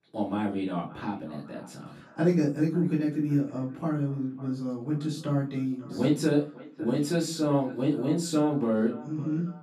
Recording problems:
off-mic speech; far
echo of what is said; faint; throughout; 550 ms later, 20 dB below the speech
room echo; slight; dies away in 0.3 s

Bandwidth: 14.5 kHz